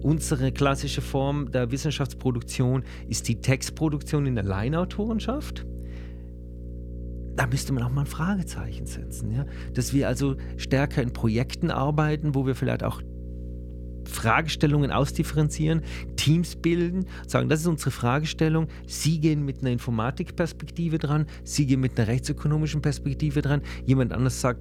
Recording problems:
electrical hum; noticeable; throughout; 60 Hz, 20 dB below the speech

